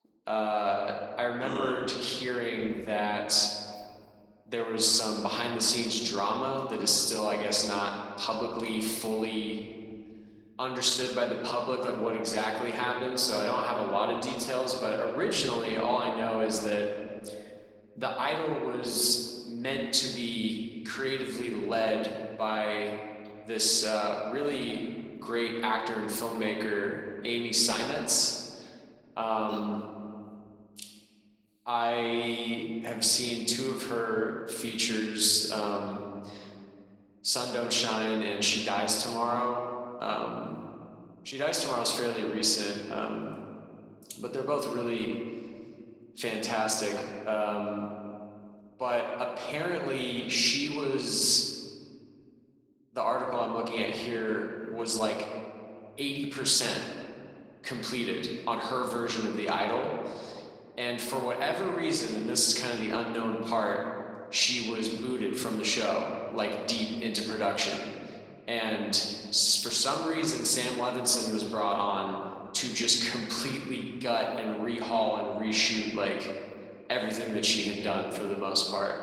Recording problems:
room echo; slight; dies away in 1.9 s
off-mic speech; somewhat distant
garbled, watery; slightly; nothing above 15.5 kHz
thin; very slightly; fading below 300 Hz

